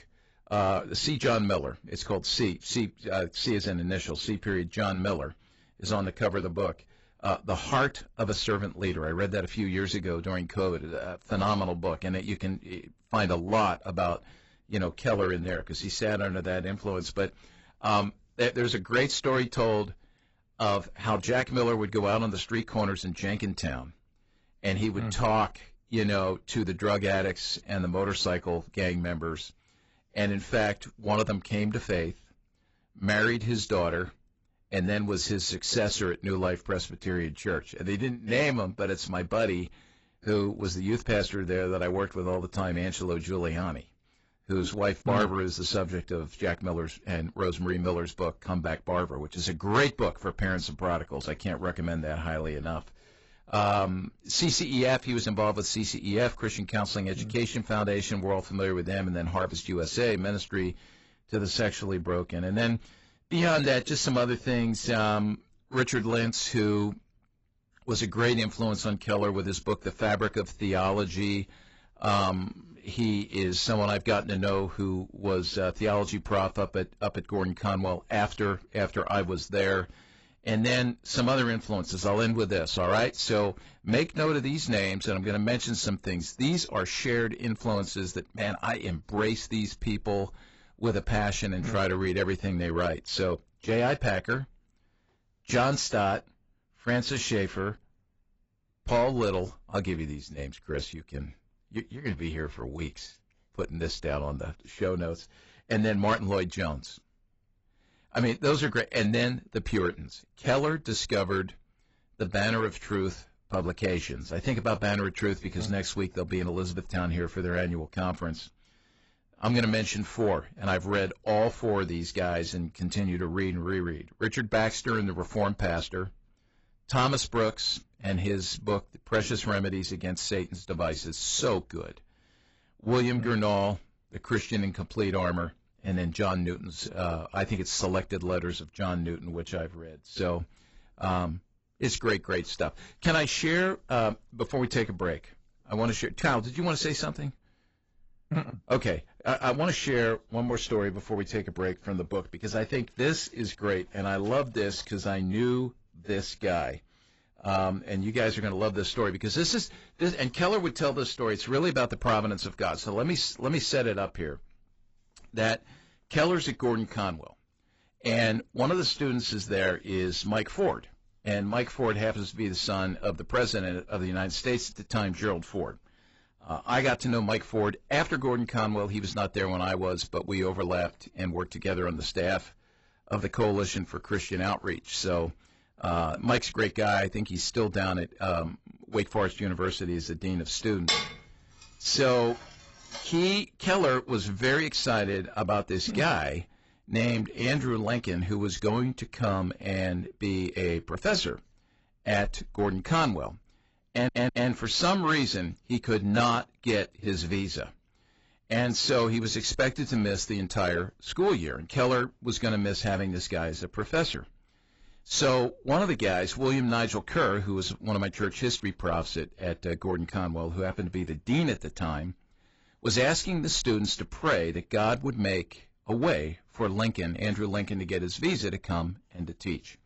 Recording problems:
garbled, watery; badly; nothing above 7.5 kHz
distortion; slight; 10 dB below the speech
clattering dishes; loud; from 3:11 to 3:13; peak 3 dB above the speech
audio stuttering; at 3:24

